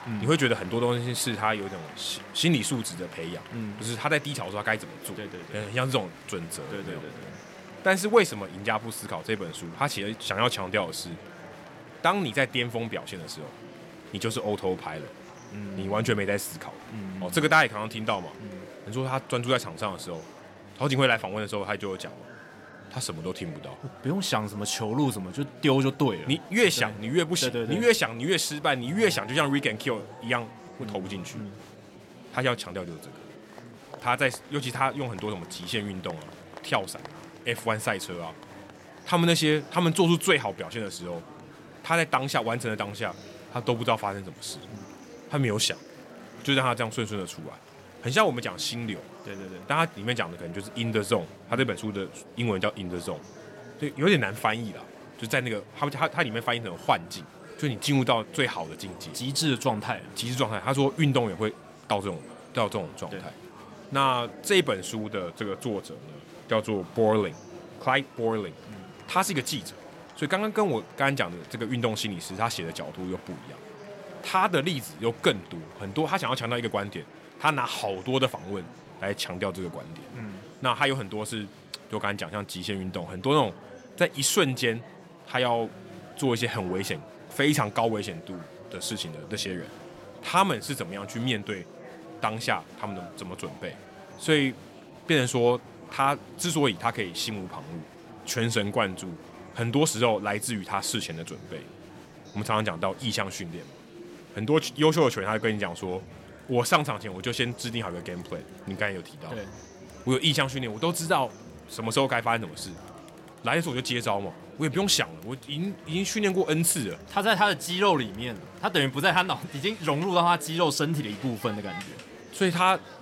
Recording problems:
murmuring crowd; noticeable; throughout; 20 dB below the speech

